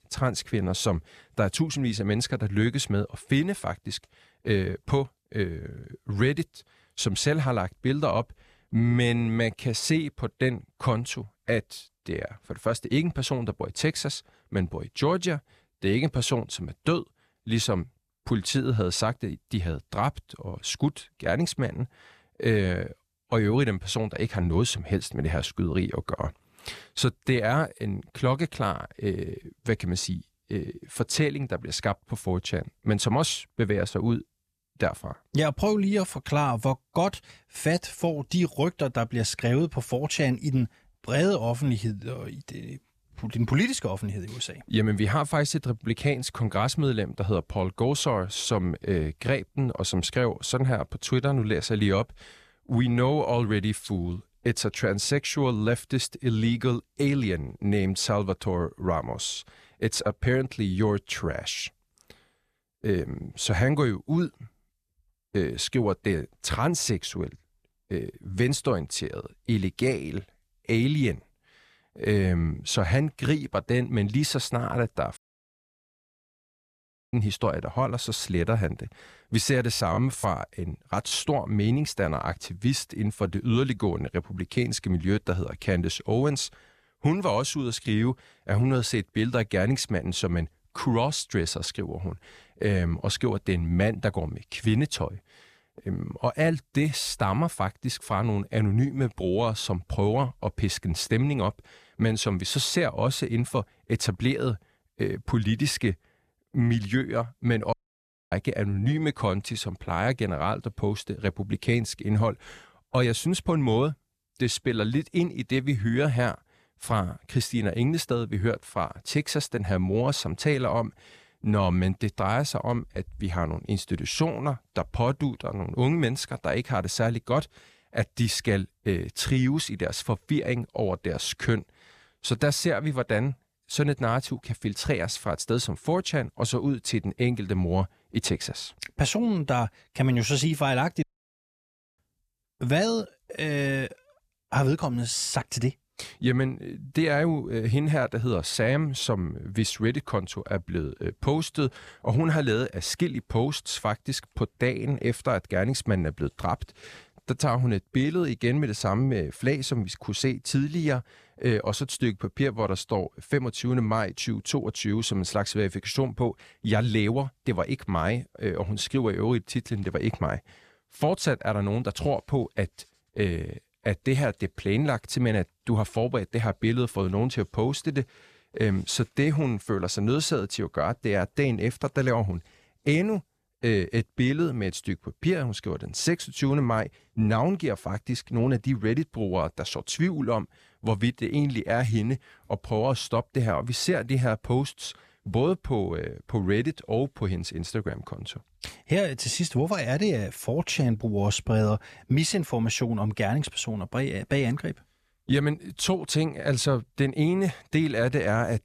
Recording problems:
audio cutting out; at 1:15 for 2 s, at 1:48 for 0.5 s and at 2:21 for 1 s

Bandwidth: 14.5 kHz